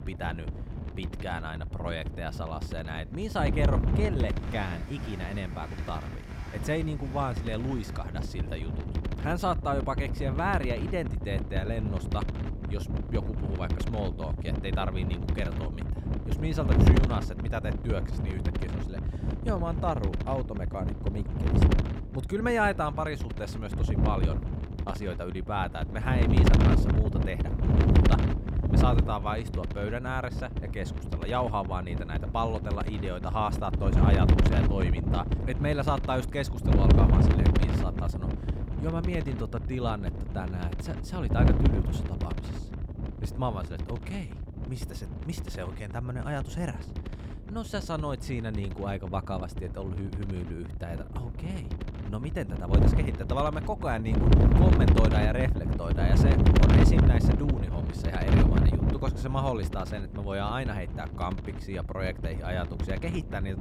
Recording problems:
wind noise on the microphone; heavy; 3 dB below the speech
train or aircraft noise; noticeable; throughout; 15 dB below the speech

